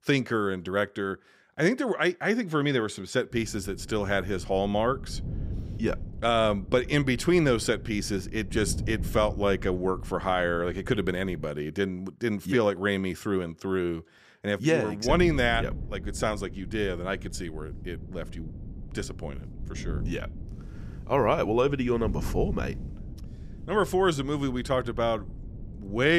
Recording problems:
wind noise on the microphone; occasional gusts; from 3.5 to 11 s and from 15 s on; 20 dB below the speech
abrupt cut into speech; at the end

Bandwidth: 15 kHz